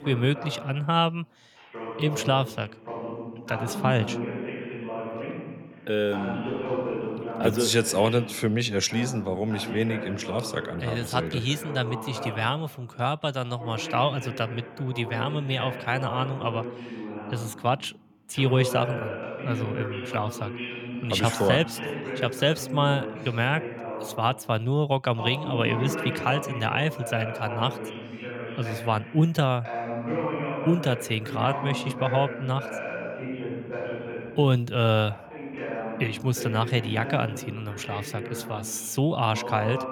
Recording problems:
voice in the background; loud; throughout; 8 dB below the speech

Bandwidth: 18 kHz